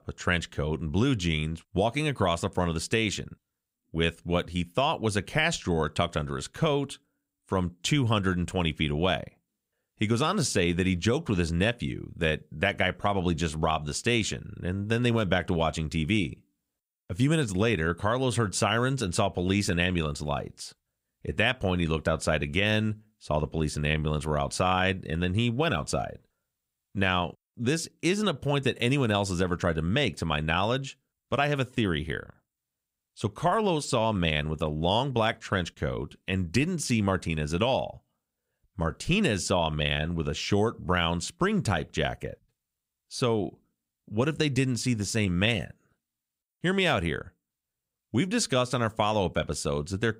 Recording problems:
none

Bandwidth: 15.5 kHz